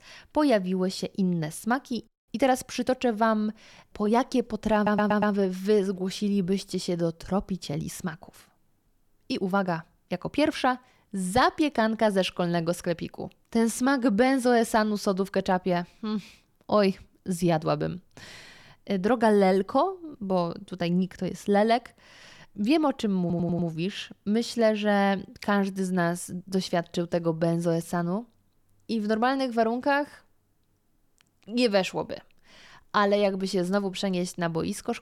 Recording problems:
audio stuttering; at 5 s and at 23 s

